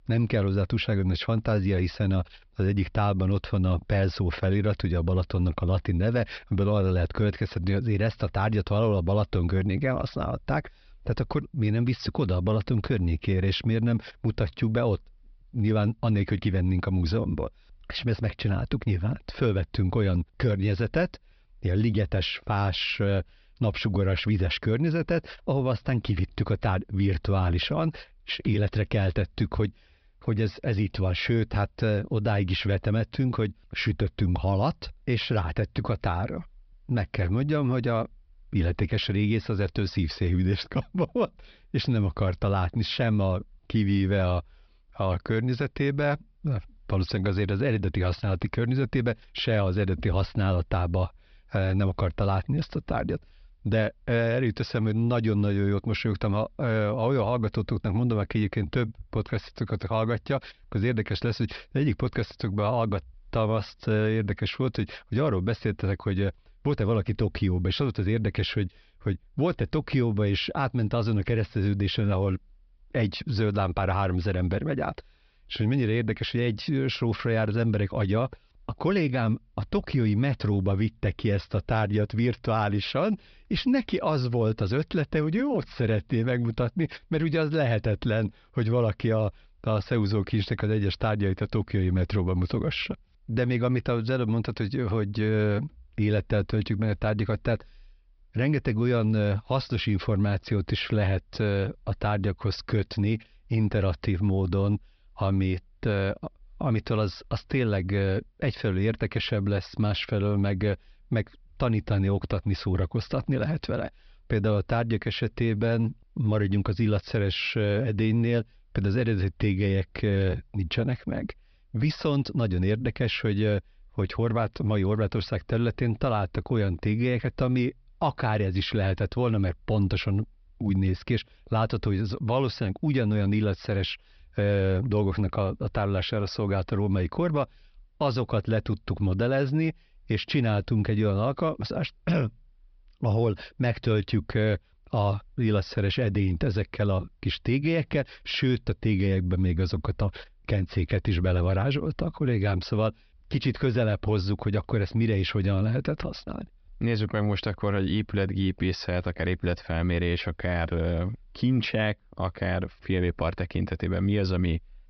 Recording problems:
high frequencies cut off; noticeable; nothing above 5.5 kHz

